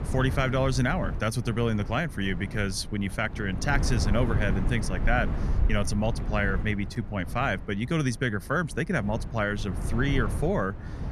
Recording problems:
wind noise on the microphone; occasional gusts; 10 dB below the speech

